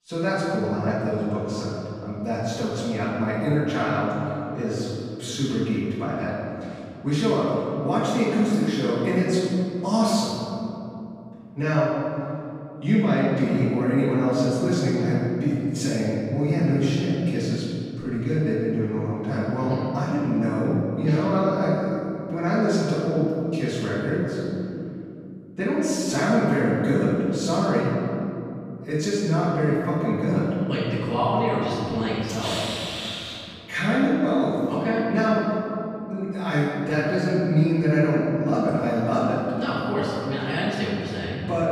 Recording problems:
room echo; strong; dies away in 3 s
off-mic speech; far

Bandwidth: 15 kHz